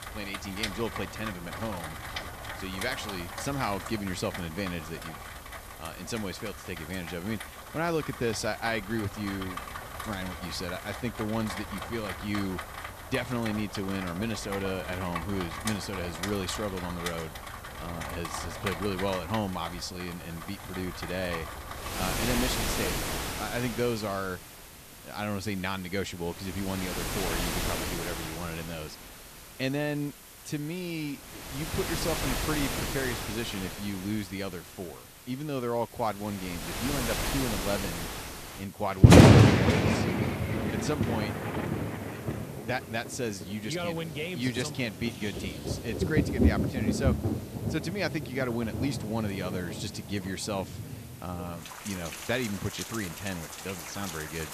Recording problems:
rain or running water; very loud; throughout; 4 dB above the speech
hiss; noticeable; throughout; 15 dB below the speech

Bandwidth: 14.5 kHz